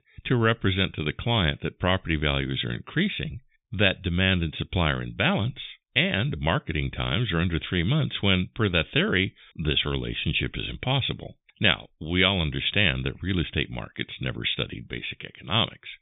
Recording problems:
high frequencies cut off; severe; nothing above 3.5 kHz

